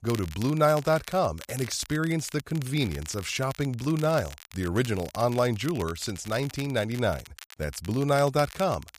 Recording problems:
crackle, like an old record; noticeable; 15 dB below the speech

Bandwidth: 15 kHz